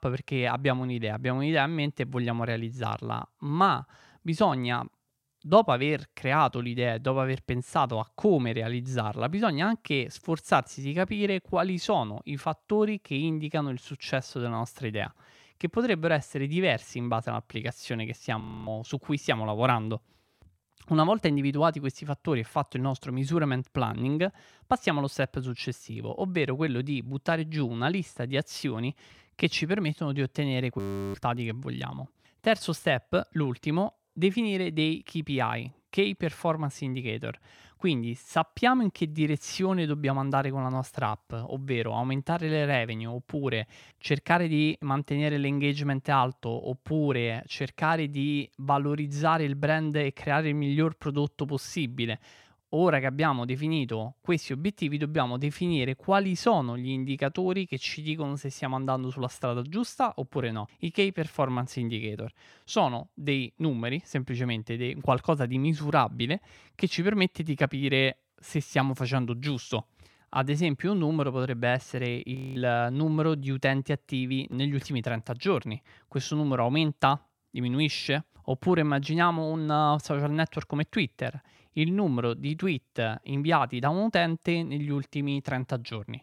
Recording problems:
audio freezing; at 18 s, at 31 s and at 1:12

